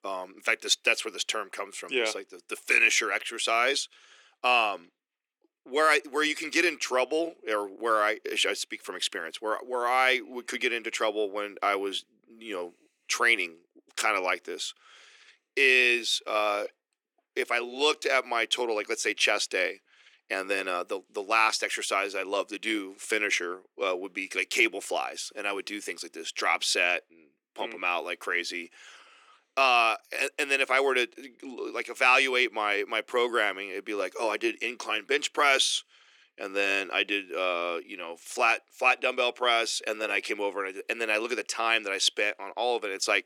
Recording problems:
thin; very; fading below 300 Hz

